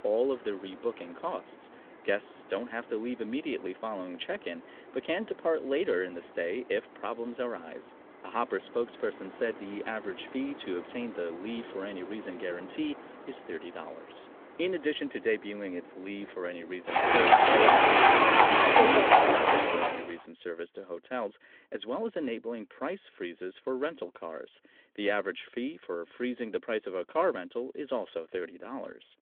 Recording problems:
phone-call audio; nothing above 3.5 kHz
animal sounds; very loud; until 20 s; 15 dB above the speech

